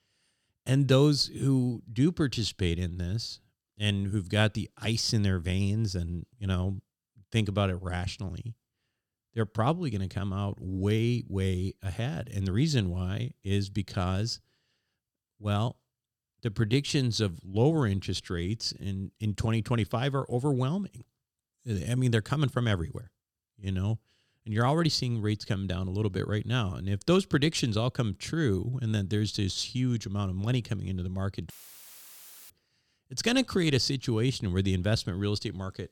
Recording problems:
audio cutting out; filled with static; at 32 s for 1 s

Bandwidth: 17.5 kHz